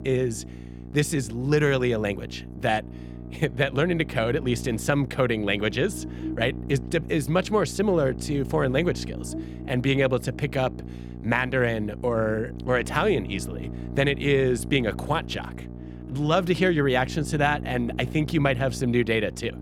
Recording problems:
electrical hum; noticeable; throughout; 60 Hz, 15 dB below the speech

